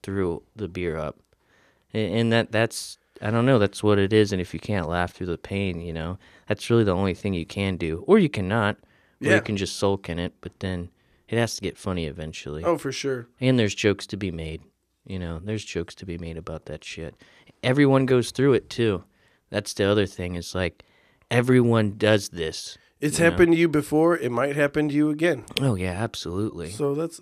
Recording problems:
none

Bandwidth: 14.5 kHz